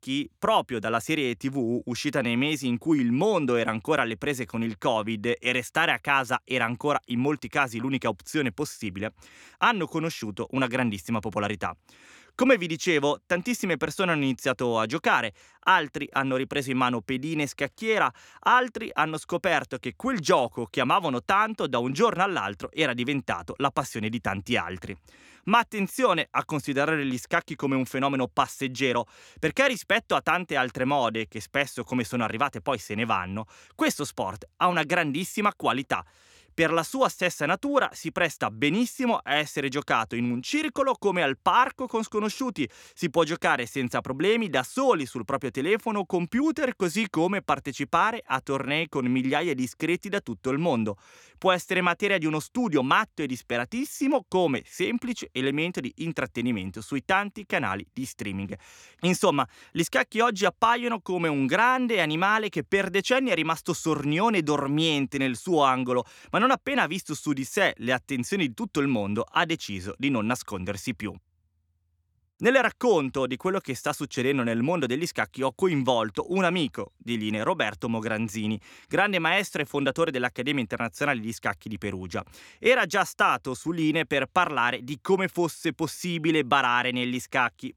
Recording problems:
none

